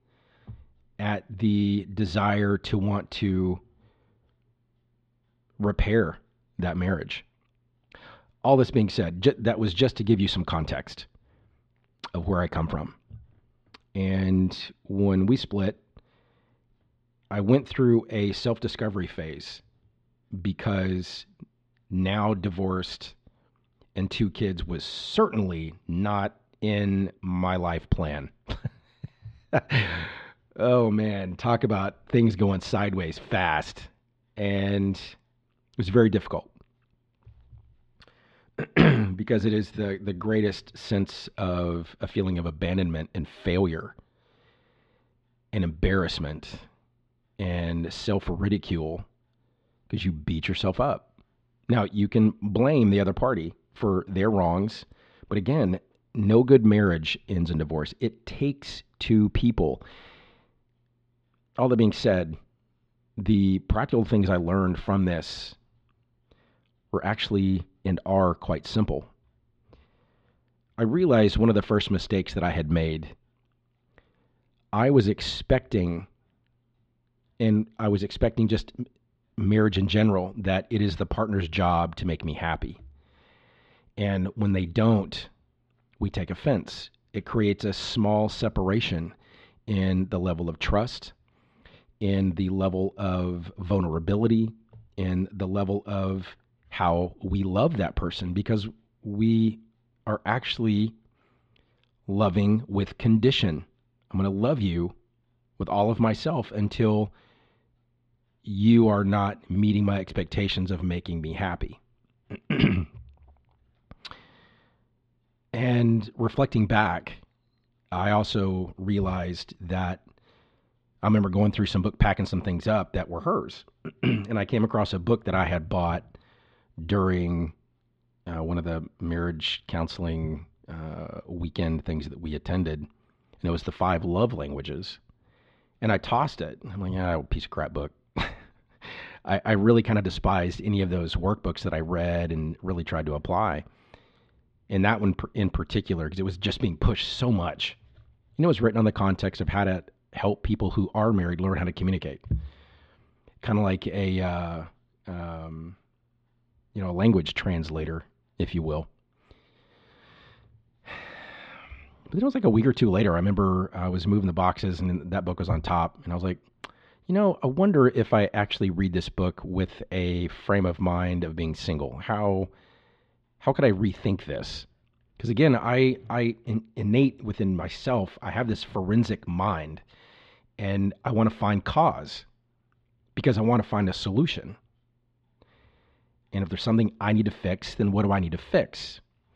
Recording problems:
muffled; slightly; fading above 3.5 kHz

